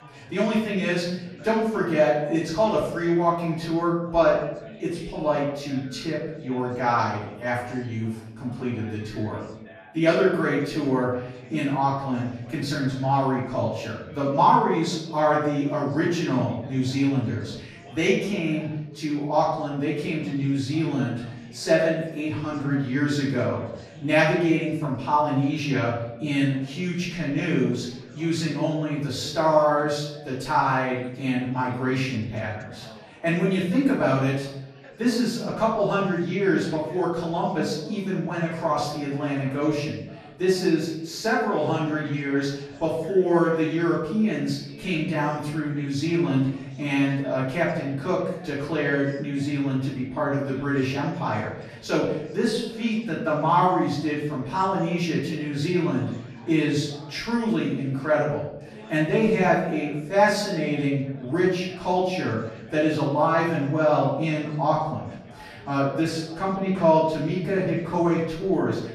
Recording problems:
off-mic speech; far
room echo; noticeable; dies away in 0.7 s
chatter from many people; faint; throughout; 25 dB below the speech

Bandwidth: 14 kHz